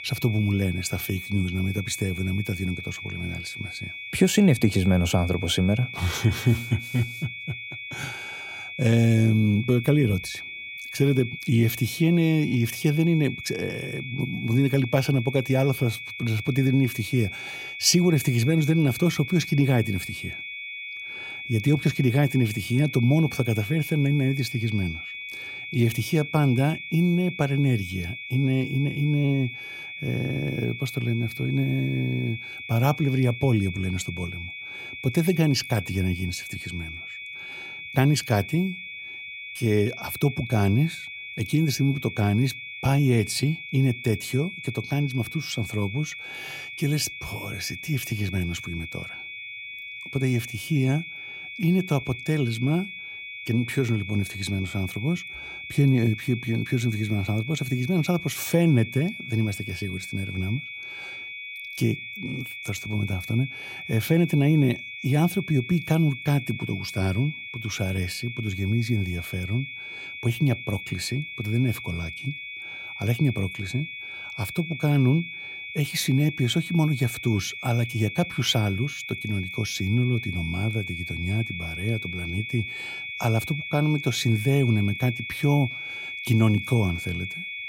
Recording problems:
high-pitched whine; loud; throughout; 2.5 kHz, 9 dB below the speech

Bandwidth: 16 kHz